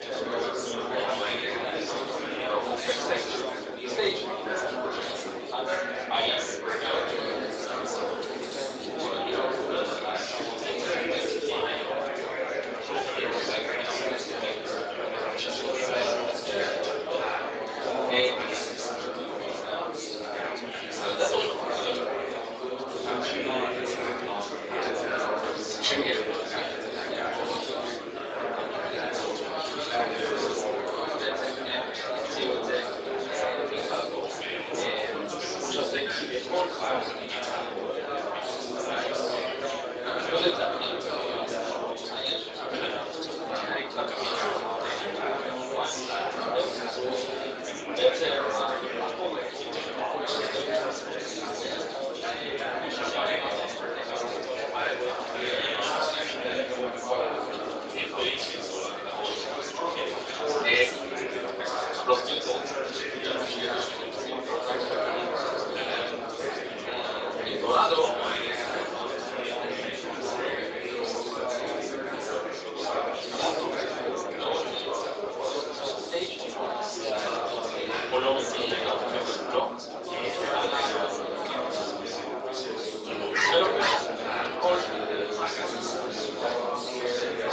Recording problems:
room echo; strong; dies away in 2 s
off-mic speech; far
thin; somewhat; fading below 400 Hz
garbled, watery; slightly; nothing above 7.5 kHz
chatter from many people; very loud; throughout; 6 dB above the speech
dog barking; loud; at 1:23; peak 10 dB above the speech

